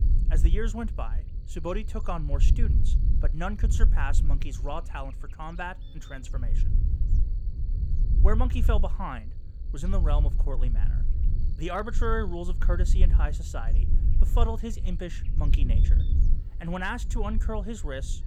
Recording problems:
low rumble; noticeable; throughout; 10 dB below the speech
electrical hum; faint; throughout; 50 Hz, 25 dB below the speech

